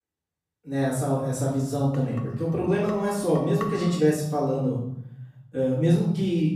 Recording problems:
off-mic speech; far
room echo; noticeable; dies away in 0.8 s
clattering dishes; noticeable; from 2 to 4 s; peak 10 dB below the speech

